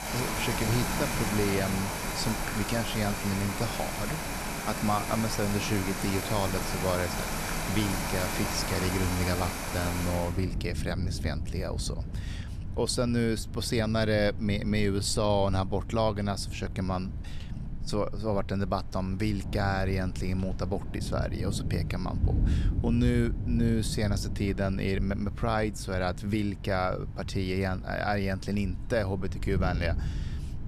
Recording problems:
rain or running water; loud; throughout; 3 dB below the speech

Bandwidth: 13.5 kHz